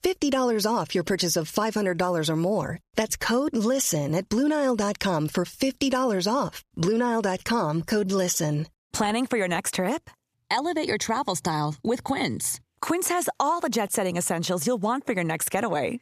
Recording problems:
squashed, flat; somewhat

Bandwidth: 14.5 kHz